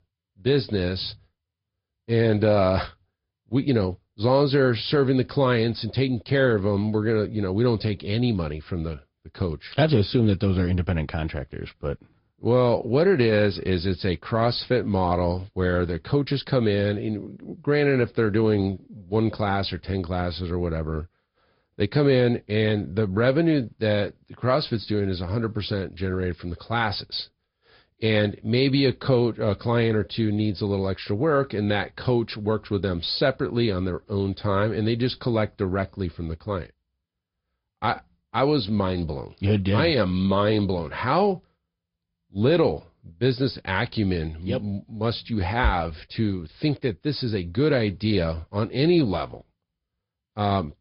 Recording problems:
high frequencies cut off; noticeable; nothing above 5 kHz
garbled, watery; slightly

